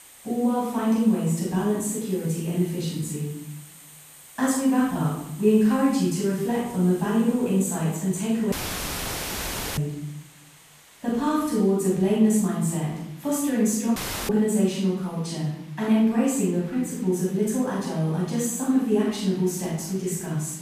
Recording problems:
room echo; strong; dies away in 0.8 s
off-mic speech; far
hiss; faint; throughout; 25 dB below the speech
audio cutting out; filled with static; at 8.5 s for 1.5 s and at 14 s

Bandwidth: 14.5 kHz